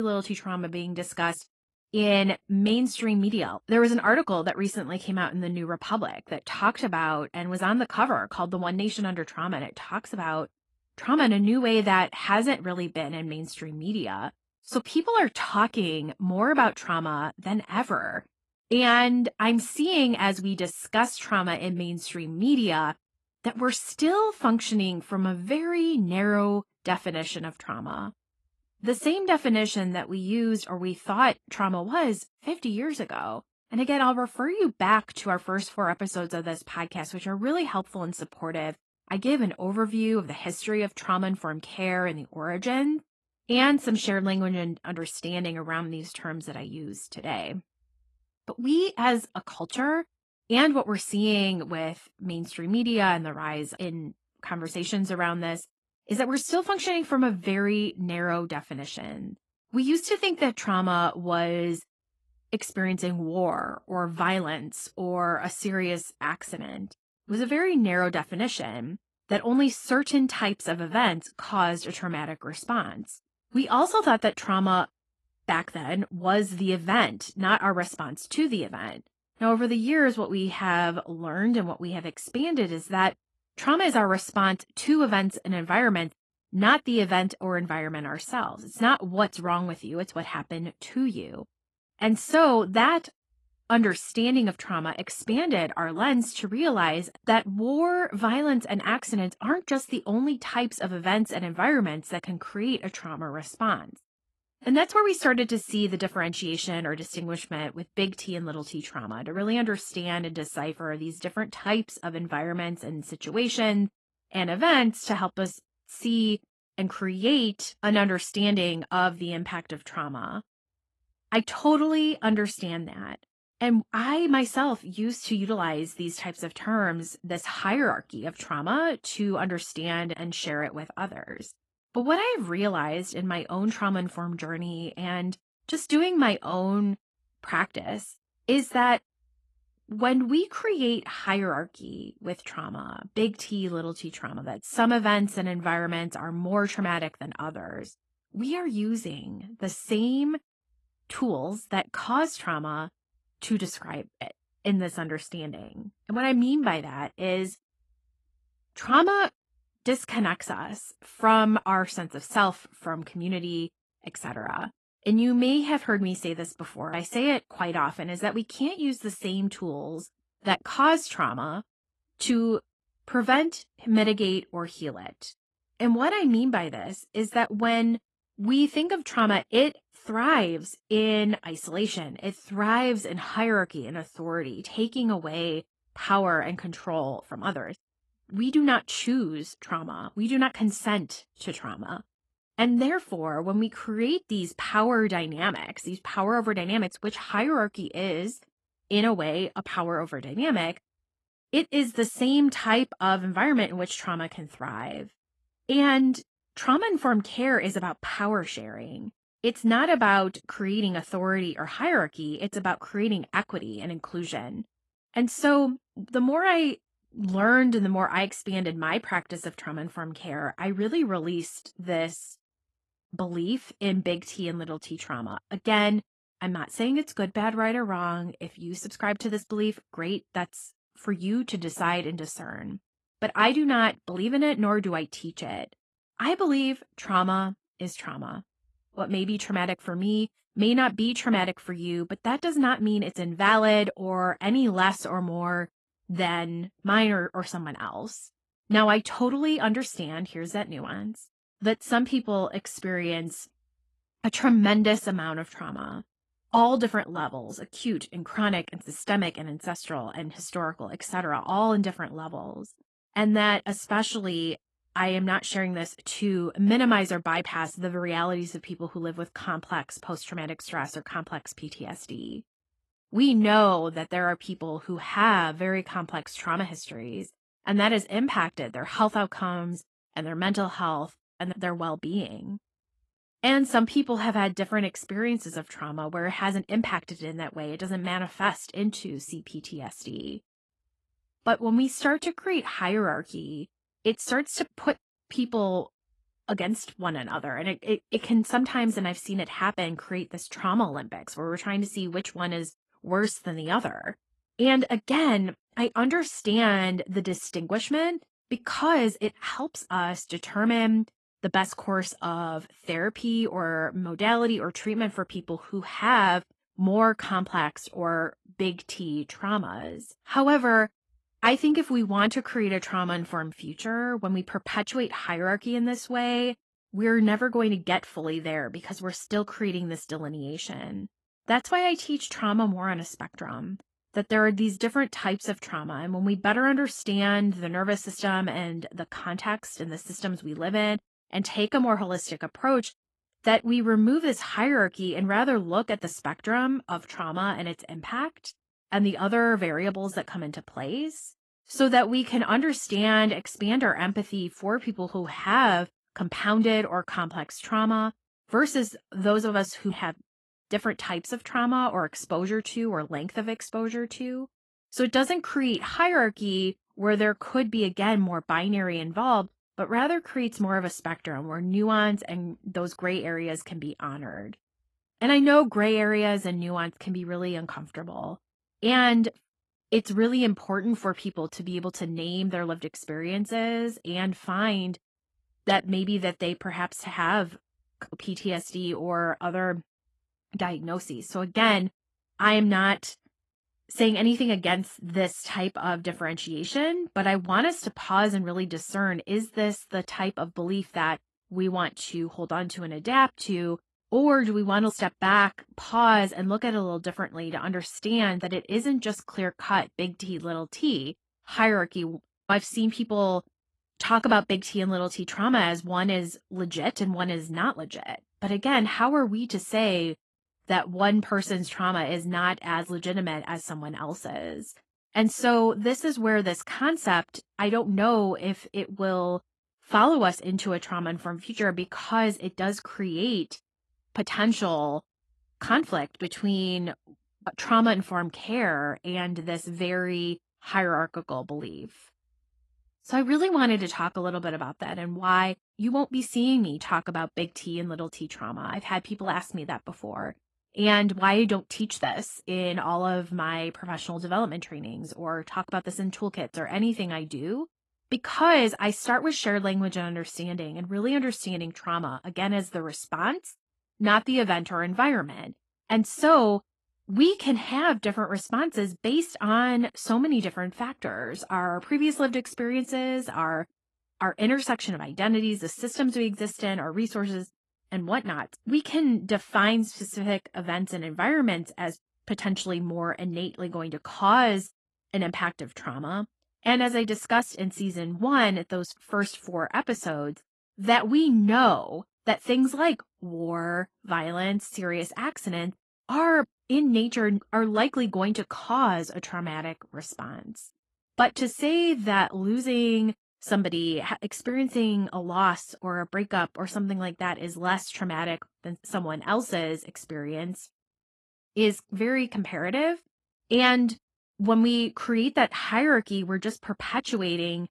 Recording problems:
garbled, watery; slightly; nothing above 11.5 kHz
abrupt cut into speech; at the start

